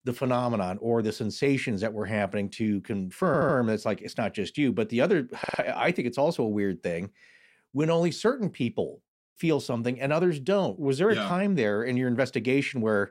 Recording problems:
audio stuttering; at 3.5 s and at 5.5 s

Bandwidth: 16 kHz